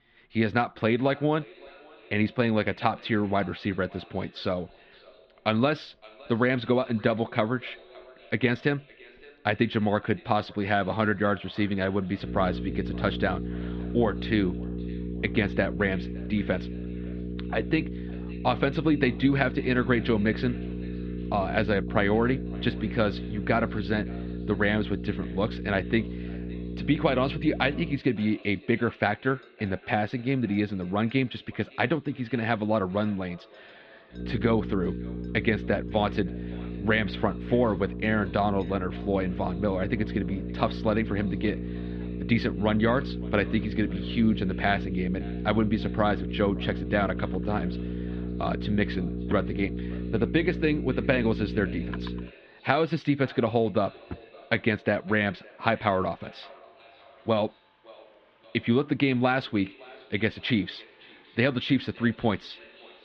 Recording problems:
muffled; very; fading above 3.5 kHz
echo of what is said; faint; throughout; 560 ms later, 25 dB below the speech
electrical hum; noticeable; from 12 to 28 s and from 34 to 52 s; 60 Hz, 10 dB below the speech
household noises; faint; throughout; 30 dB below the speech

